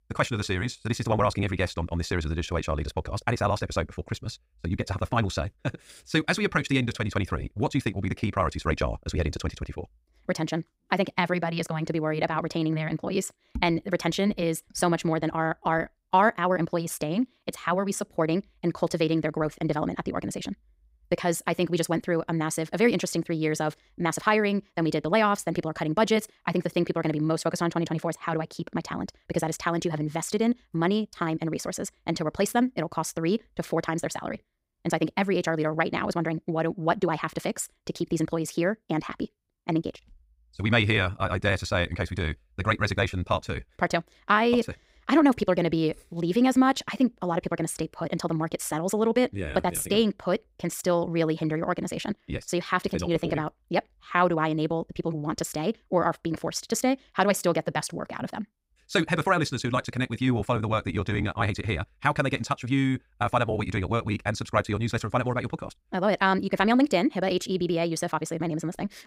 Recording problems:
wrong speed, natural pitch; too fast; 1.7 times normal speed

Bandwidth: 15.5 kHz